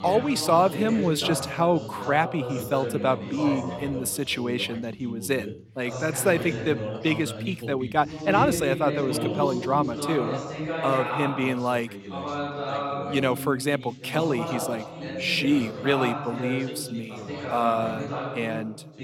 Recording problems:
background chatter; loud; throughout; 2 voices, 6 dB below the speech

